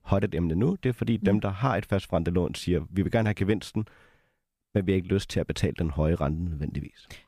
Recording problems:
none

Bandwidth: 15 kHz